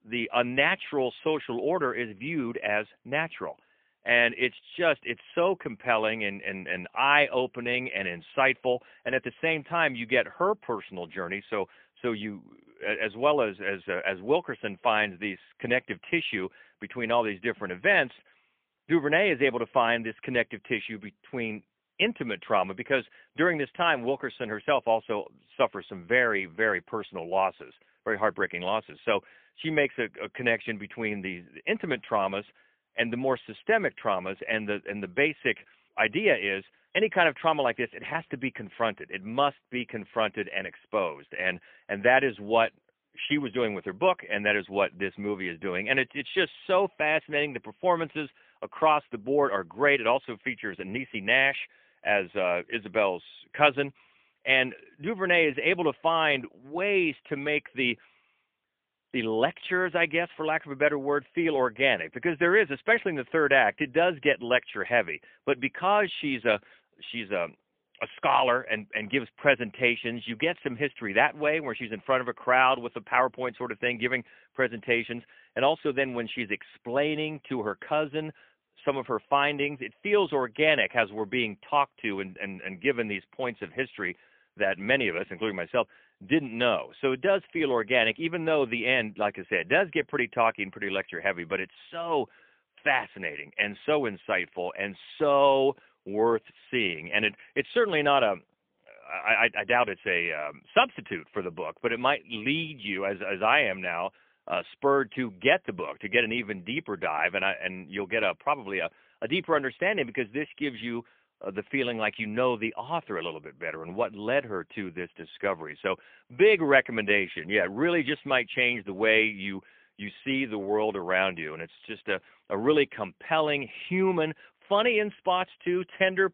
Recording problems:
phone-call audio; poor line; nothing above 3.5 kHz

